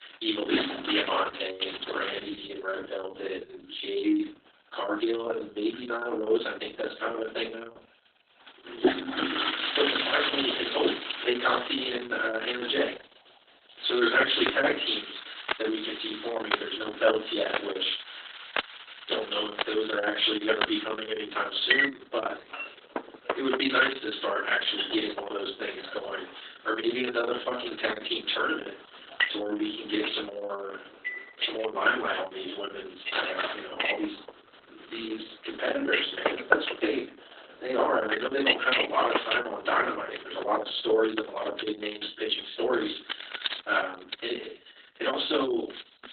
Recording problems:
off-mic speech; far
garbled, watery; badly; nothing above 4 kHz
thin; somewhat; fading below 250 Hz
room echo; slight; dies away in 0.3 s
household noises; loud; throughout; 2 dB below the speech

